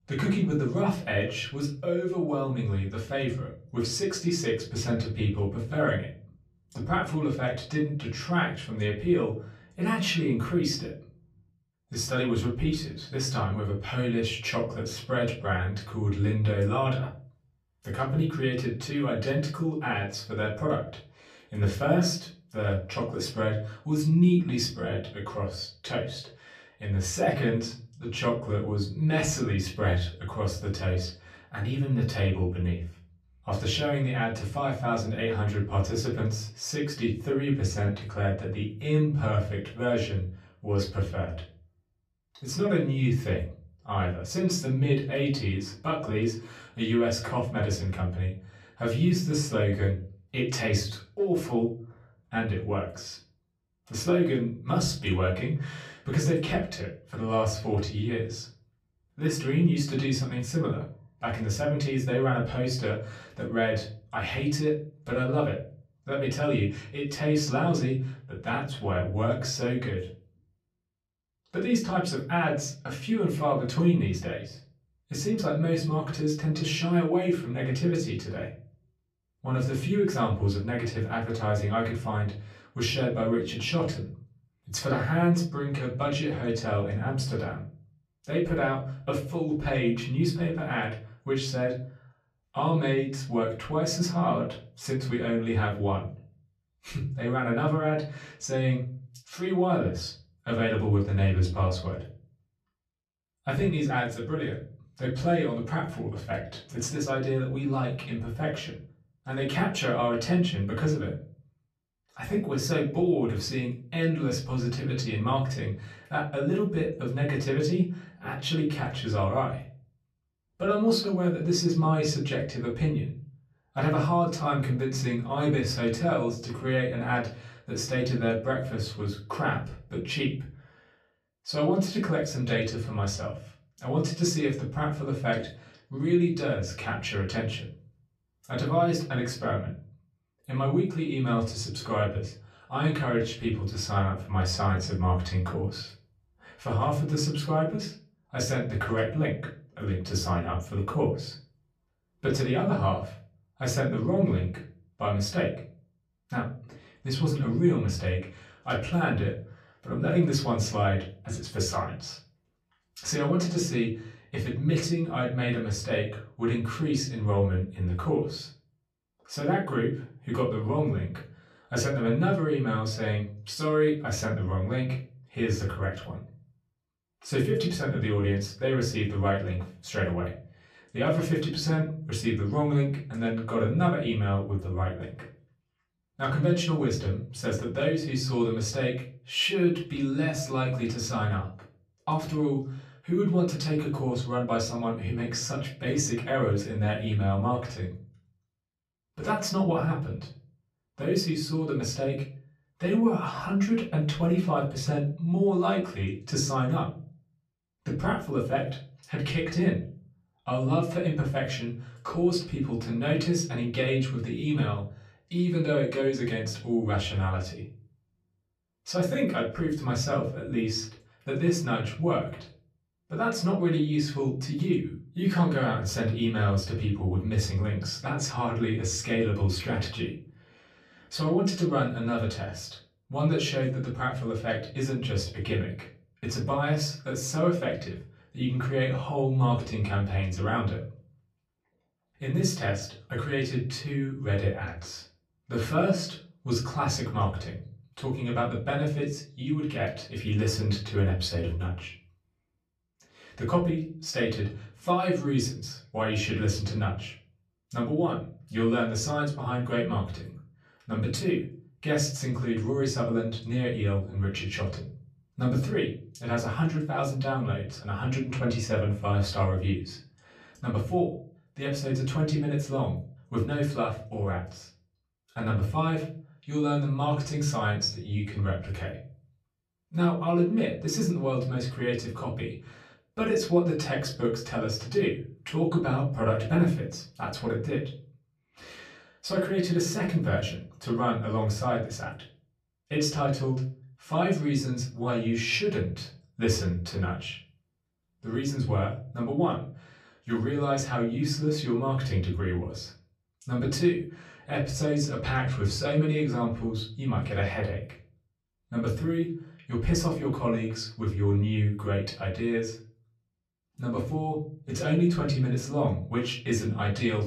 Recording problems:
off-mic speech; far
room echo; slight; dies away in 0.4 s

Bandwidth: 14.5 kHz